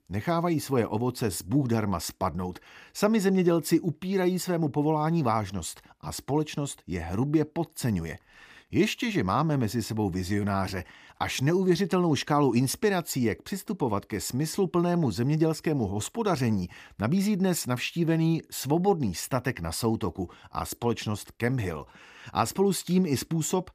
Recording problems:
none

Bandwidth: 15 kHz